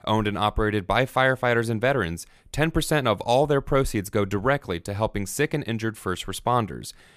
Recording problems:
none

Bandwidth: 14.5 kHz